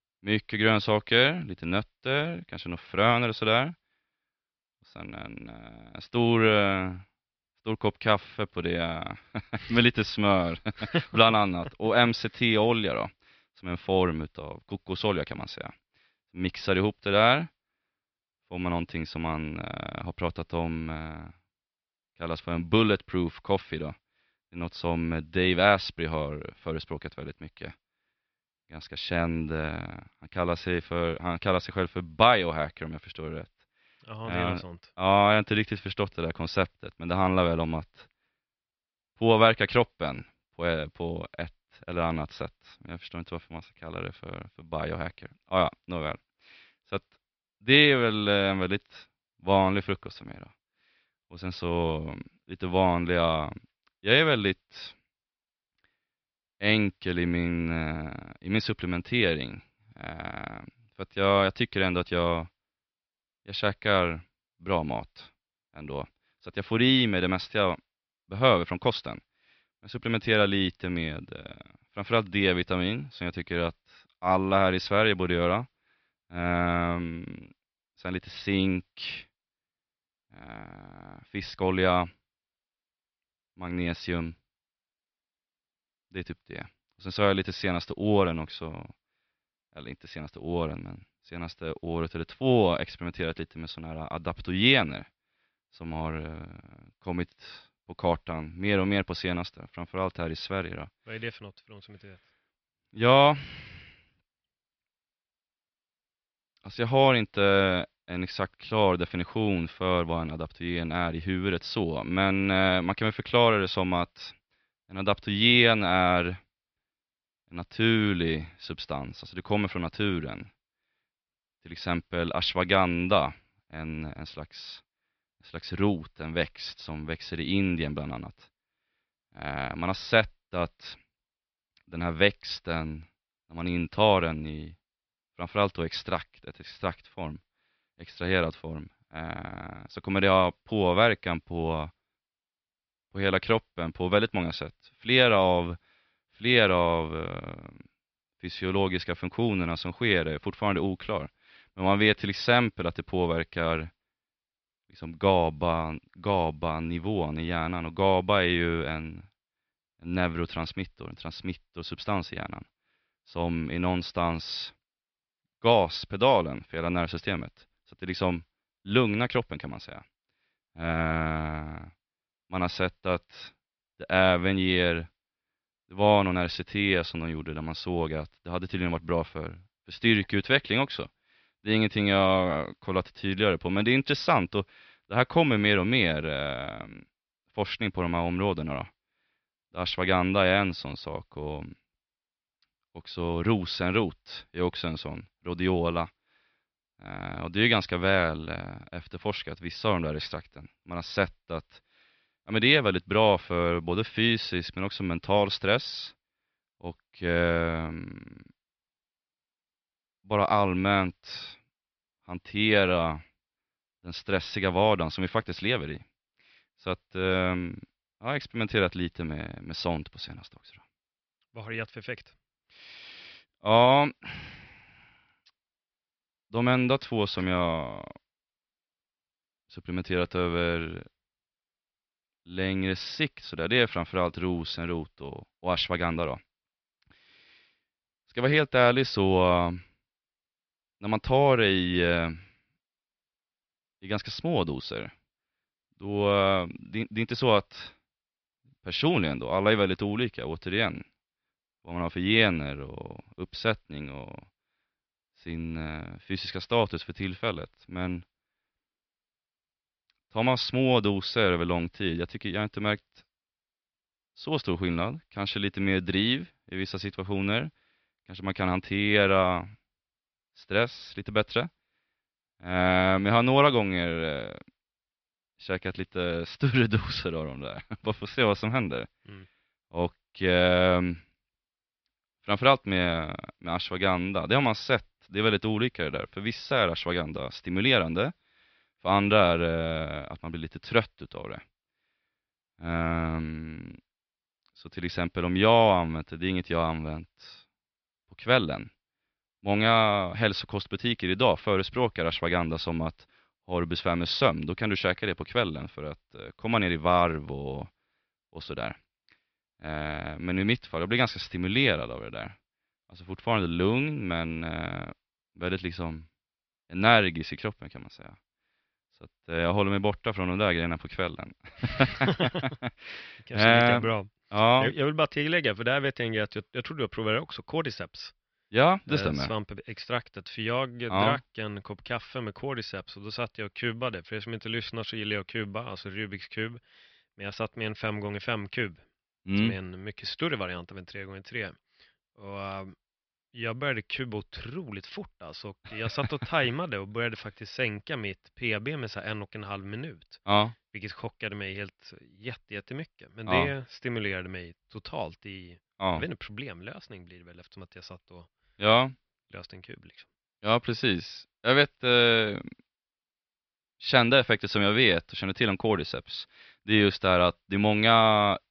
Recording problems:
high frequencies cut off; noticeable; nothing above 5.5 kHz

